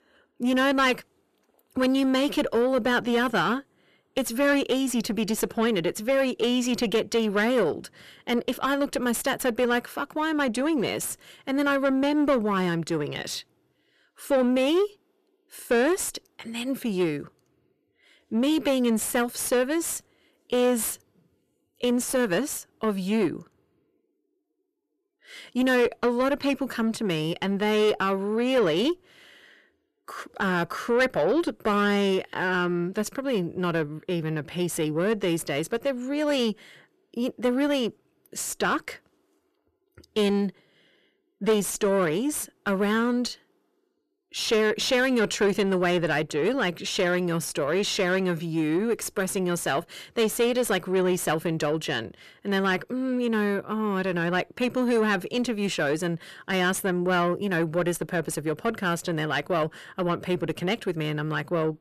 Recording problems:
distortion; slight; 10 dB below the speech

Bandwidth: 14 kHz